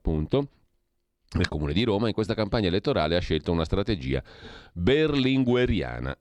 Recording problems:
none

